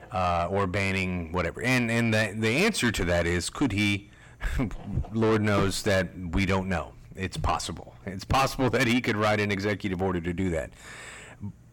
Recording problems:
distortion; heavy; 7 dB below the speech

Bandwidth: 17.5 kHz